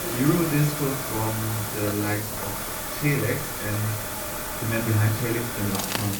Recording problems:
off-mic speech; far
room echo; slight; dies away in 0.4 s
household noises; loud; throughout; 9 dB below the speech
hiss; loud; throughout; 3 dB below the speech
crowd noise; noticeable; throughout; 20 dB below the speech
voice in the background; very faint; throughout; 30 dB below the speech

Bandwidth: 18.5 kHz